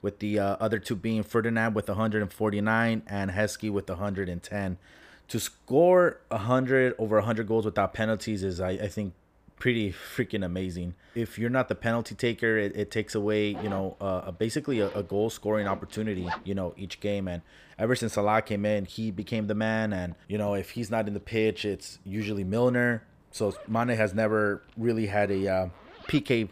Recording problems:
household noises; noticeable; from 13 s on; 15 dB below the speech

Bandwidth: 15 kHz